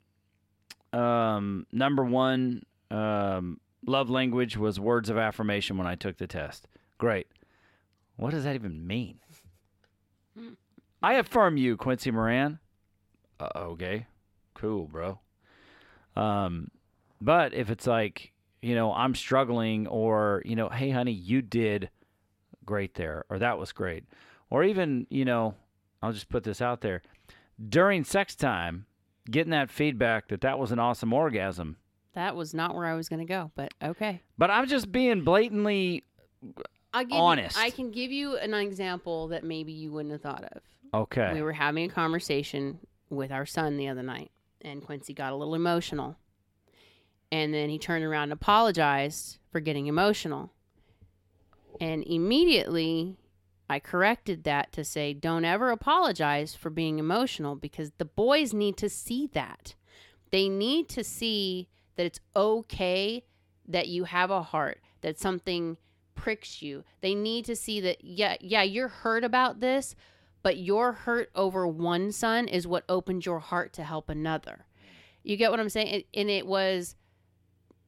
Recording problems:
none

